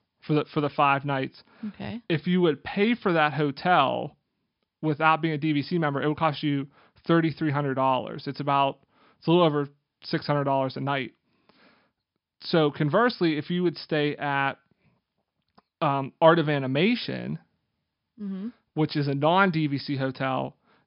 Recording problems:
high frequencies cut off; noticeable; nothing above 5.5 kHz

